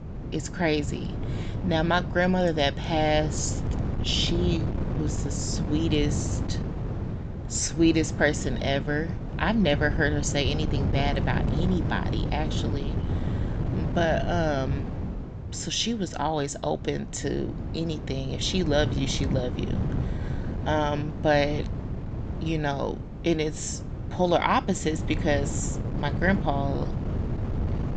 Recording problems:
high frequencies cut off; noticeable; nothing above 8 kHz
wind noise on the microphone; occasional gusts; 10 dB below the speech

